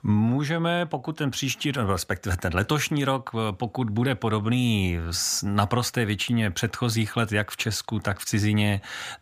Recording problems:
none

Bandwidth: 15 kHz